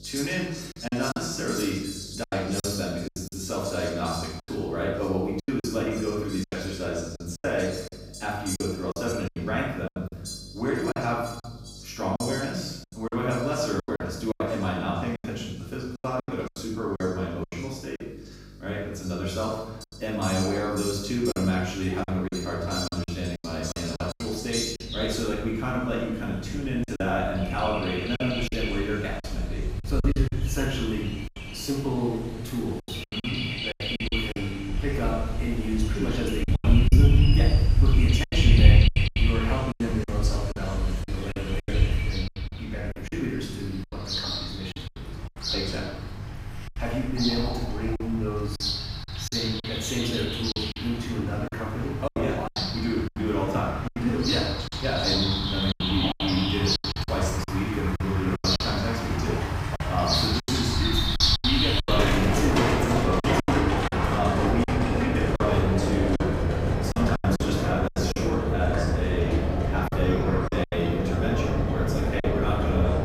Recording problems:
room echo; strong; dies away in 0.8 s
off-mic speech; far
animal sounds; very loud; throughout; 3 dB above the speech
electrical hum; faint; throughout; 50 Hz, 25 dB below the speech
choppy; very; 9% of the speech affected

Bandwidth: 15.5 kHz